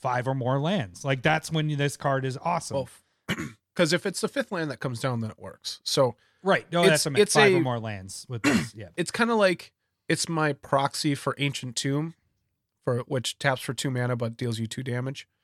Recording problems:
none

